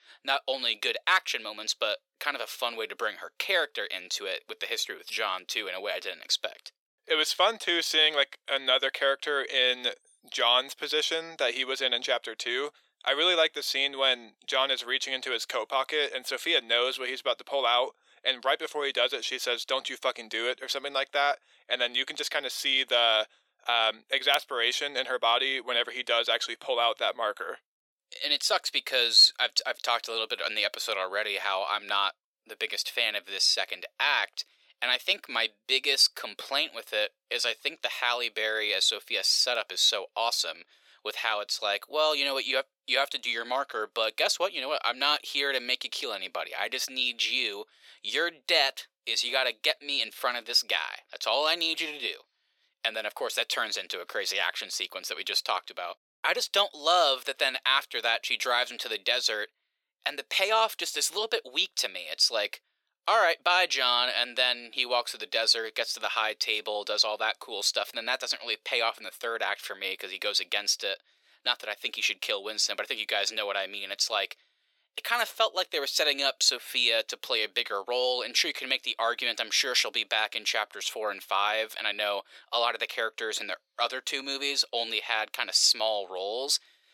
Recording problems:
thin; very; fading below 450 Hz

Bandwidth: 17 kHz